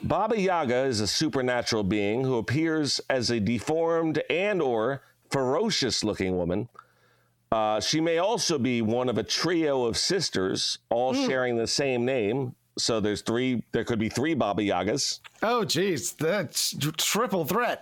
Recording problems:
squashed, flat; heavily

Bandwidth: 17 kHz